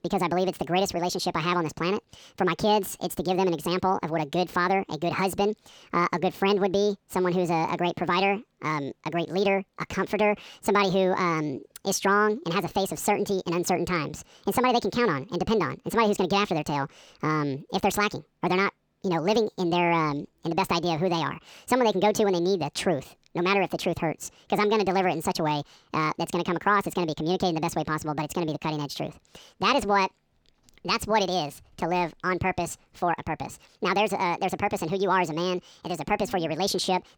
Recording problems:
wrong speed and pitch; too fast and too high; 1.6 times normal speed

